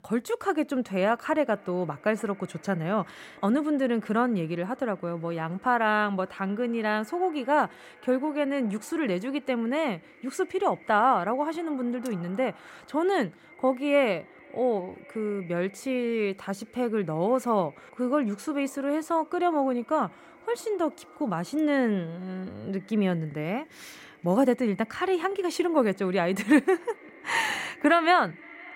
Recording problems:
echo of what is said; faint; throughout; 520 ms later, 25 dB below the speech

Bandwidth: 16 kHz